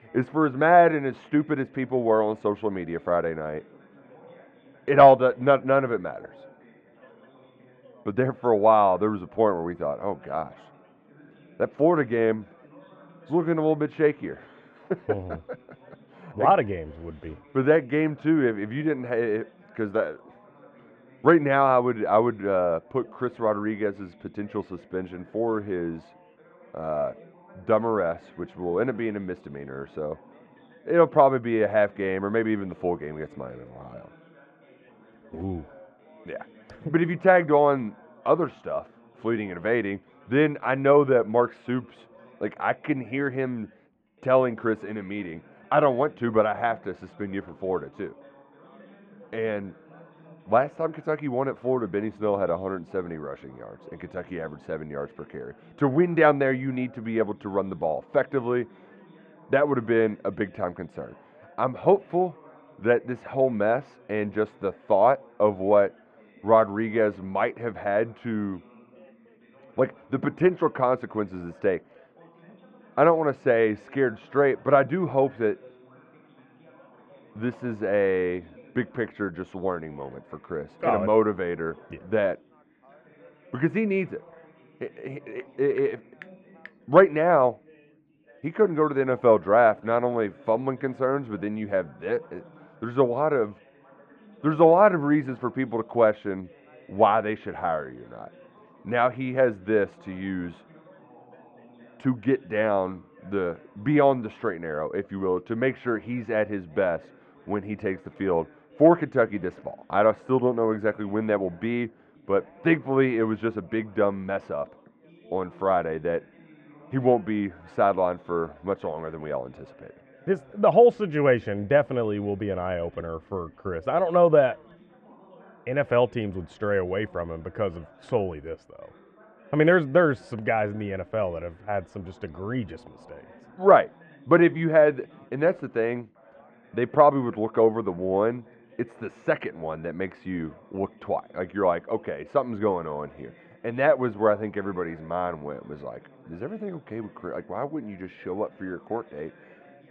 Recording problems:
muffled; very; fading above 1.5 kHz
background chatter; faint; throughout; 4 voices, 30 dB below the speech

